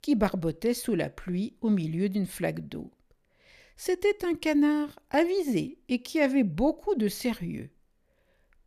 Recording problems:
none

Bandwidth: 14.5 kHz